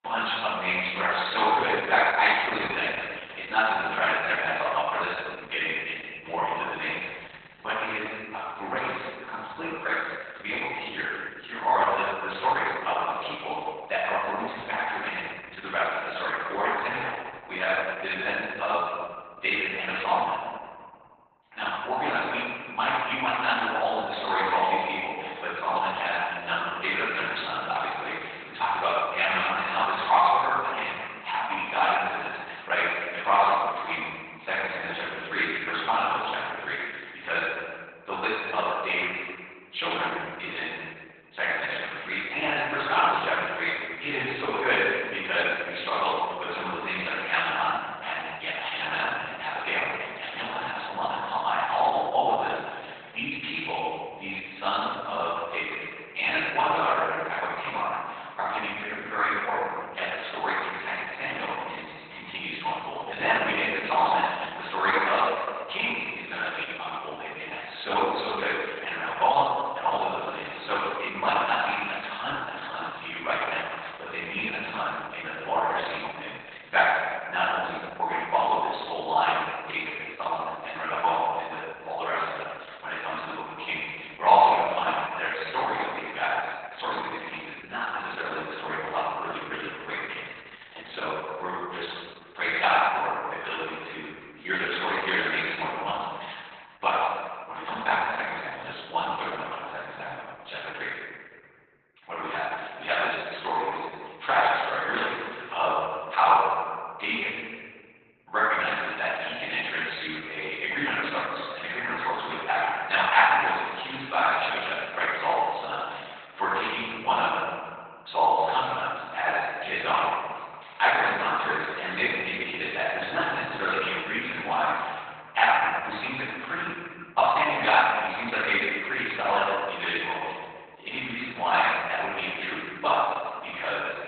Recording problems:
room echo; strong; dies away in 1.6 s
off-mic speech; far
garbled, watery; badly; nothing above 4 kHz
thin; very; fading below 800 Hz

